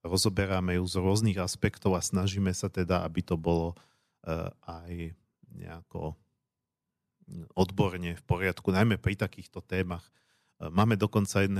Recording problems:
abrupt cut into speech; at the end

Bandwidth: 13.5 kHz